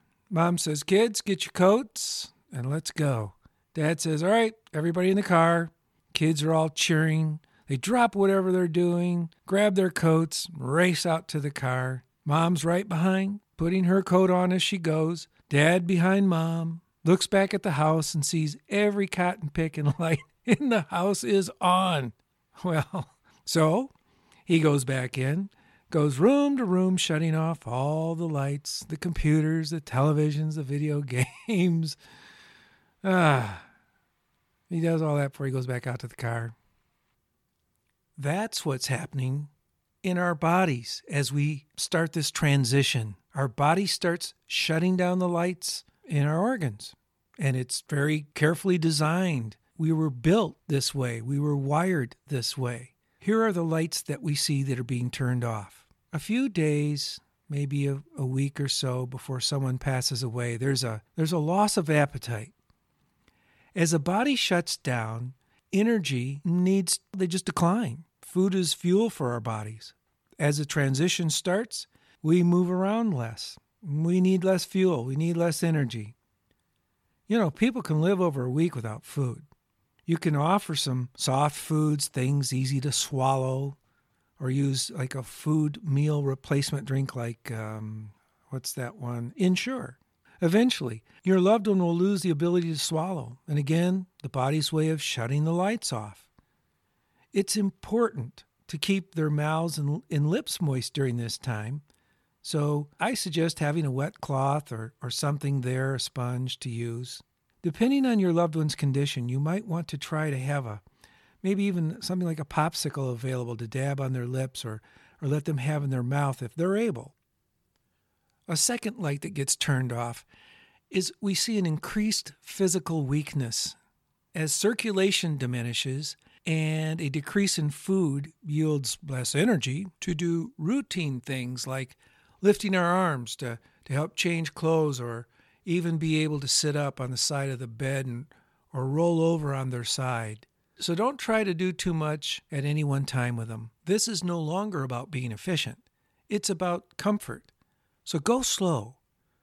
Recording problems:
none

